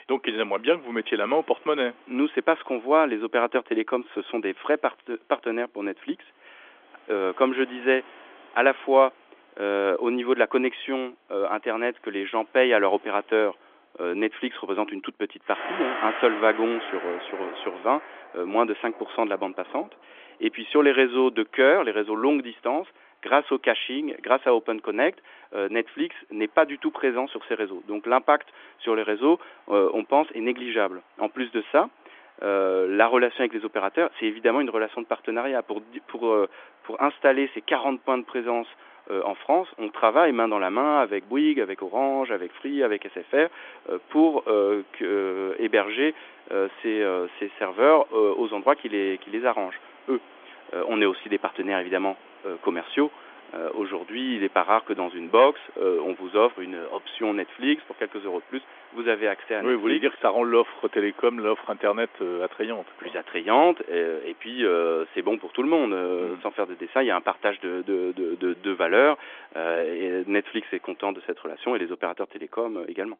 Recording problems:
phone-call audio; nothing above 3.5 kHz
rain or running water; noticeable; throughout; 20 dB below the speech

